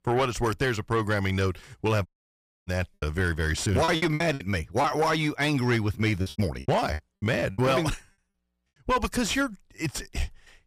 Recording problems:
distortion; slight; 10 dB below the speech
audio cutting out; at 2 s for 0.5 s
choppy; very; from 2.5 to 5 s and from 6 to 7.5 s; 15% of the speech affected

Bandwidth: 15 kHz